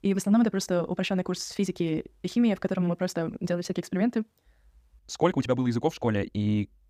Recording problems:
wrong speed, natural pitch; too fast; 1.6 times normal speed

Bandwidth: 15 kHz